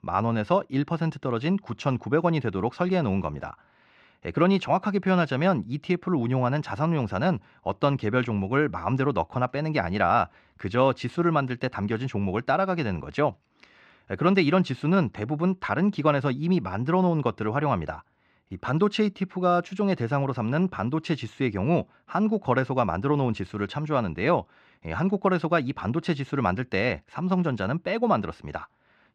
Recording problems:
muffled; slightly; fading above 3 kHz

